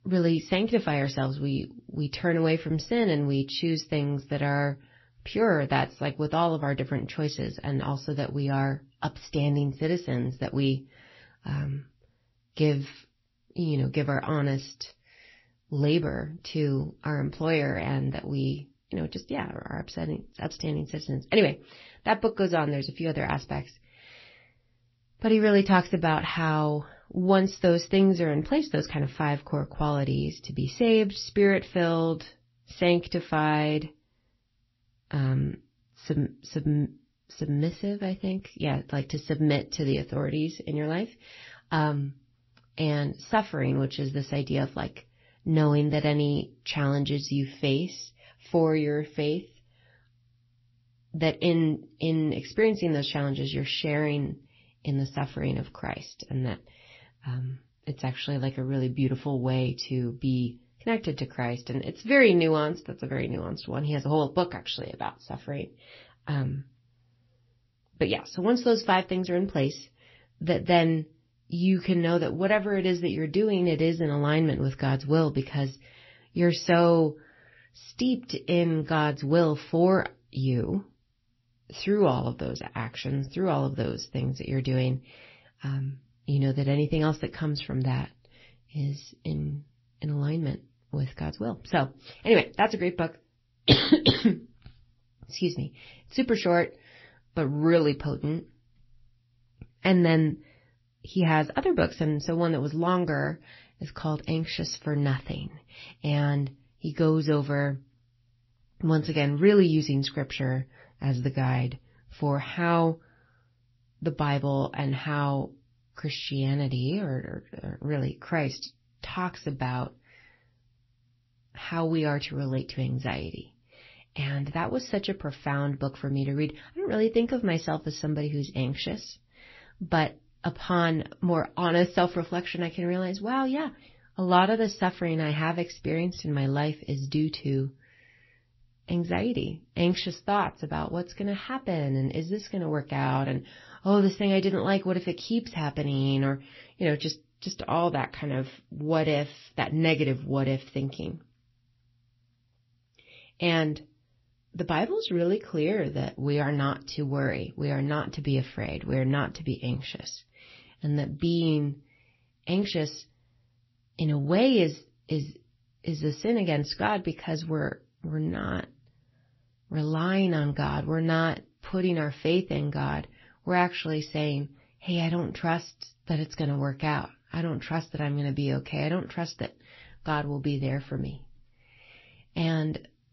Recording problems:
garbled, watery; slightly; nothing above 5.5 kHz

